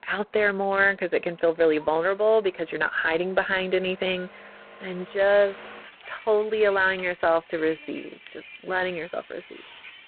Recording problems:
phone-call audio; poor line; nothing above 4 kHz
traffic noise; faint; throughout; 20 dB below the speech

